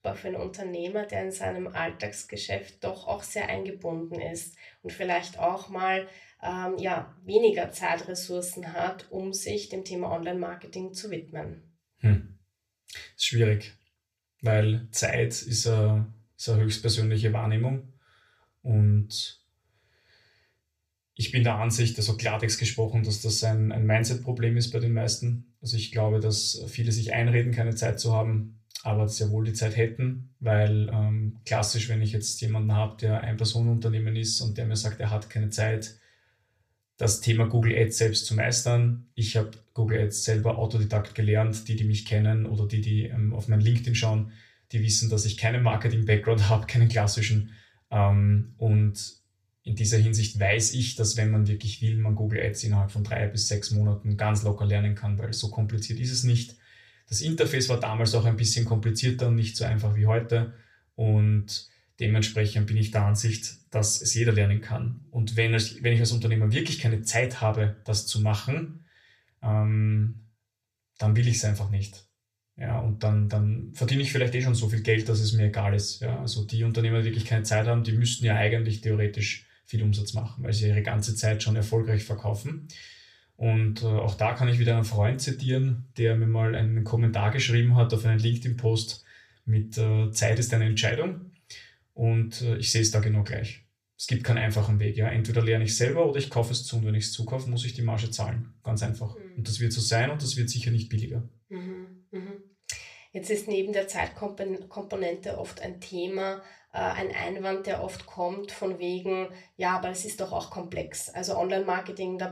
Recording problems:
off-mic speech; far
room echo; very slight; dies away in 0.3 s

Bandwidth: 14.5 kHz